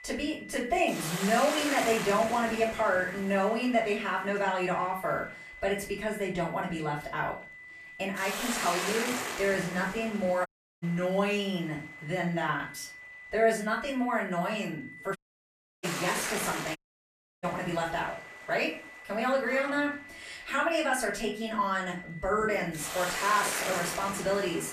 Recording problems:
off-mic speech; far
room echo; slight; dies away in 0.3 s
hiss; loud; throughout; 5 dB below the speech
high-pitched whine; noticeable; throughout; 2 kHz, 15 dB below the speech
animal sounds; very faint; throughout; 15 dB below the speech
audio cutting out; at 10 s, at 15 s for 0.5 s and at 17 s for 0.5 s

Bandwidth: 14.5 kHz